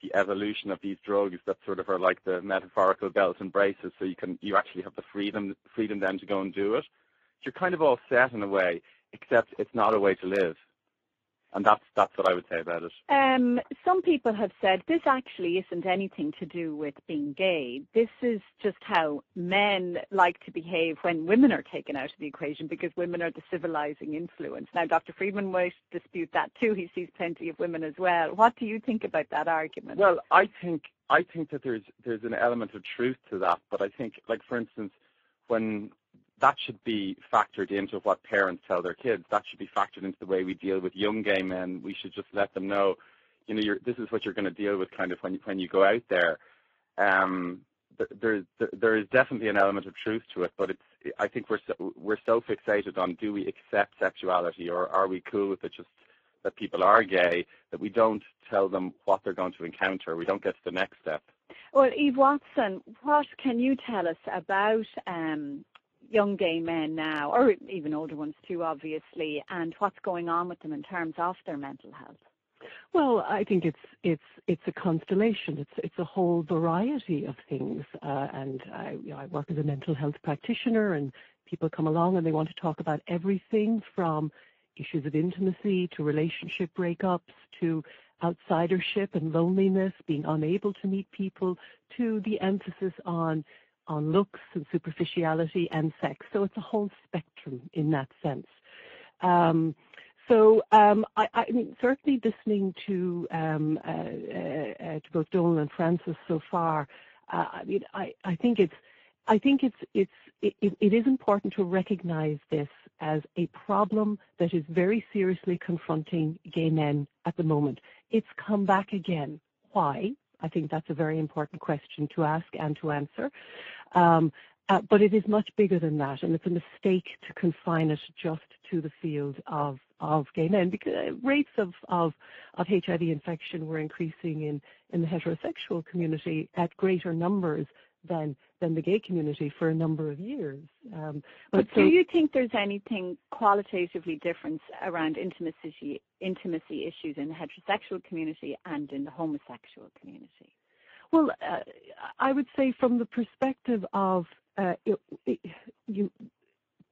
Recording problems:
phone-call audio; poor line
garbled, watery; slightly

